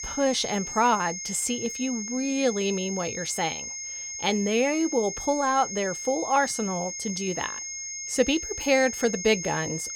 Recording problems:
high-pitched whine; loud; throughout; 6.5 kHz, 6 dB below the speech

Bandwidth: 17 kHz